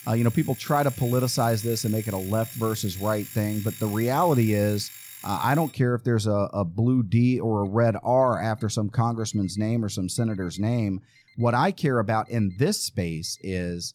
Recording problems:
alarms or sirens; noticeable; throughout; 15 dB below the speech

